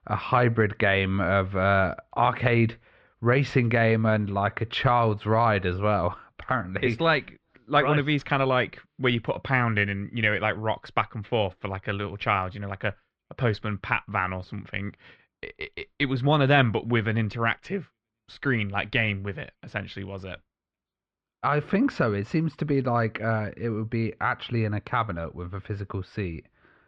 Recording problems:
muffled; very; fading above 3 kHz

